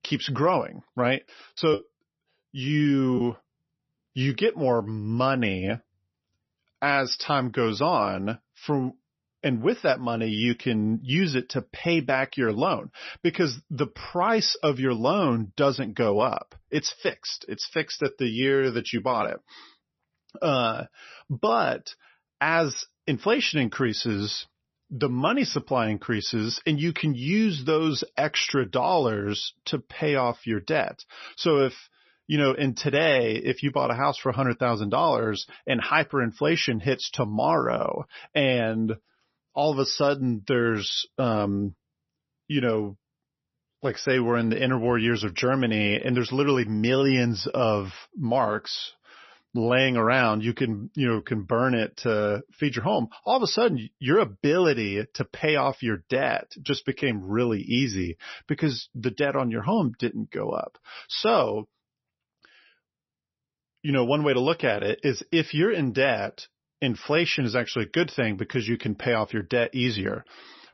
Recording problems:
garbled, watery; slightly; nothing above 6 kHz
choppy; very; from 1.5 to 3 s; 8% of the speech affected

